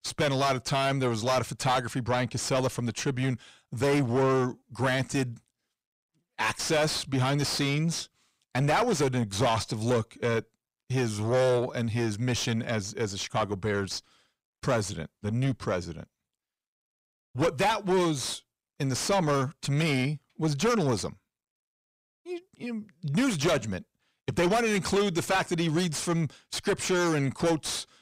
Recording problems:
distortion; heavy; 6 dB below the speech

